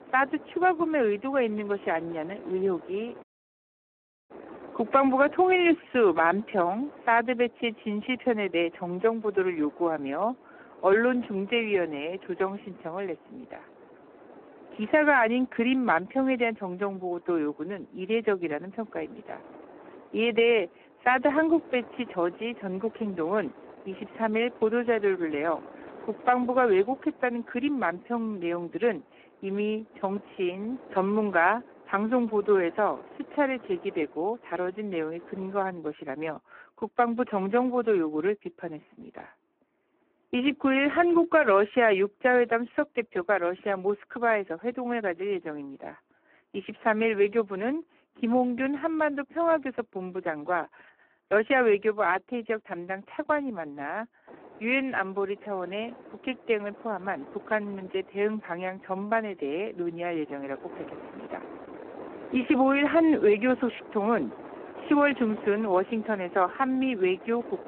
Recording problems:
phone-call audio; poor line
wind noise on the microphone; occasional gusts; until 36 s and from 54 s on; 20 dB below the speech
audio cutting out; at 3 s for 1 s

